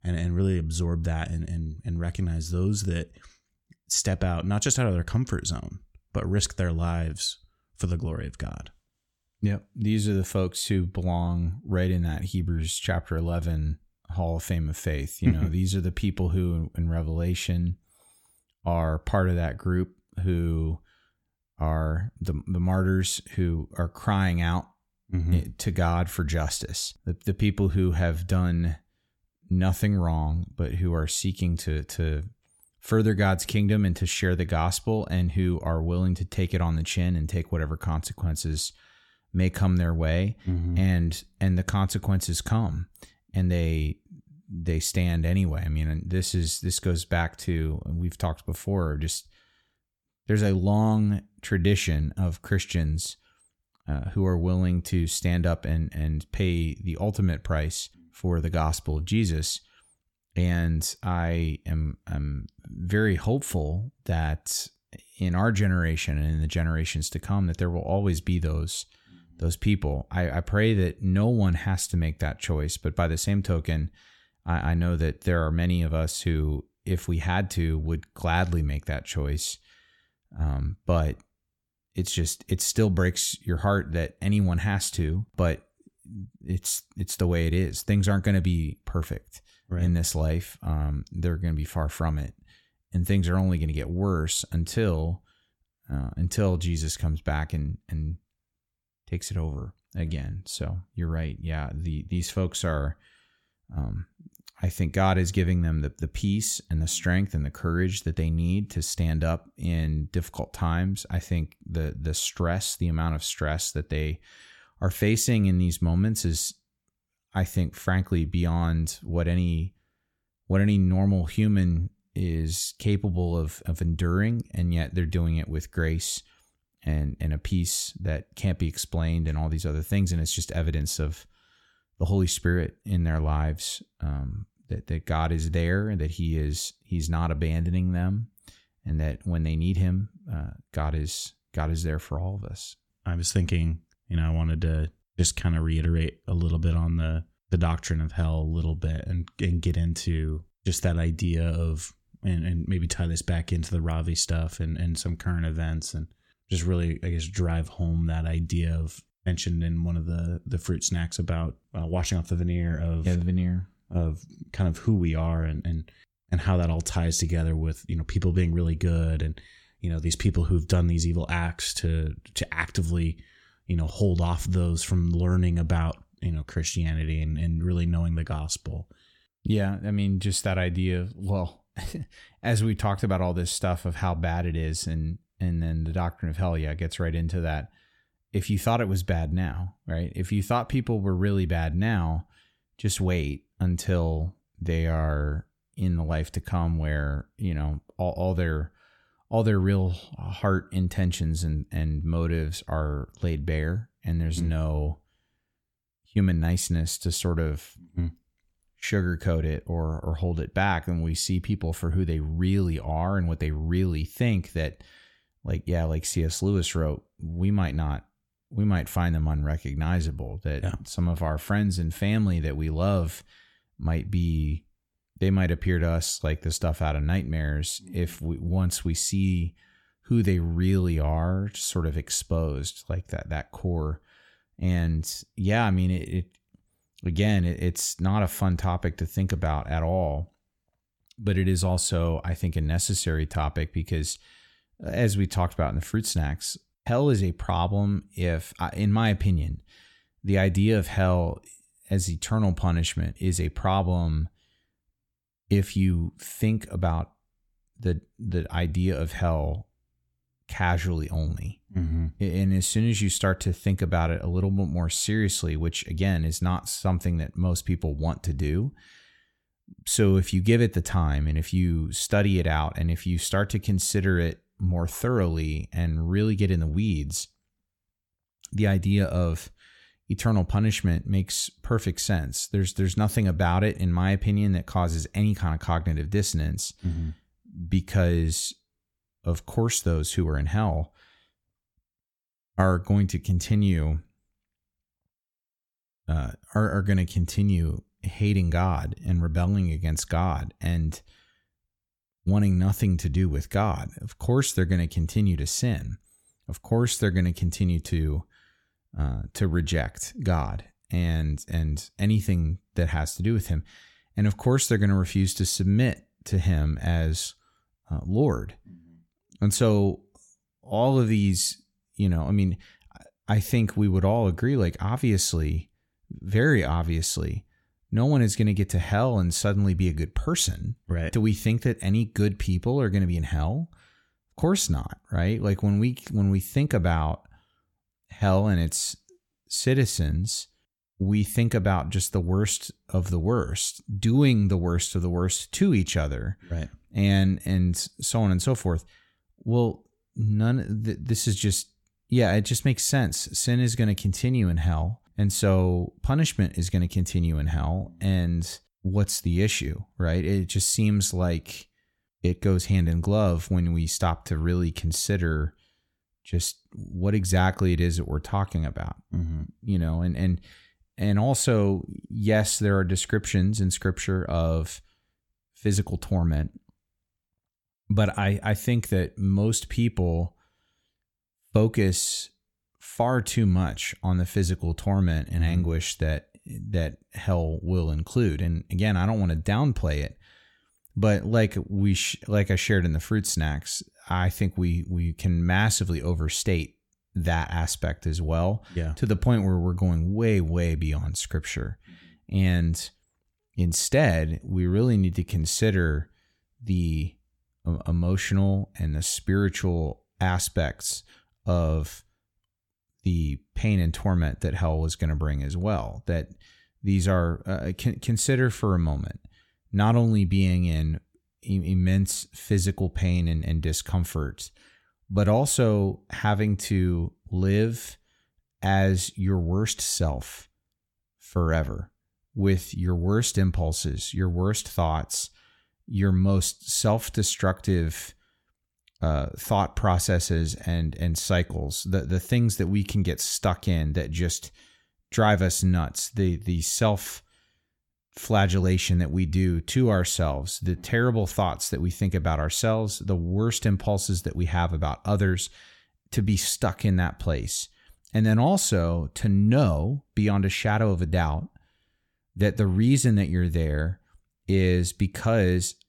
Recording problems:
none

